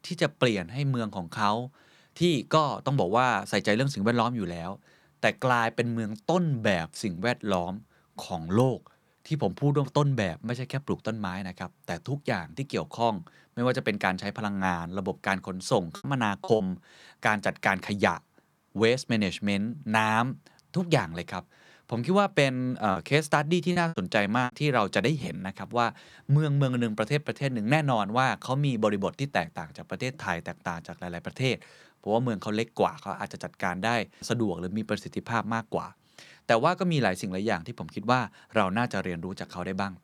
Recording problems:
choppy; very; at 16 s and from 23 to 25 s; 13% of the speech affected

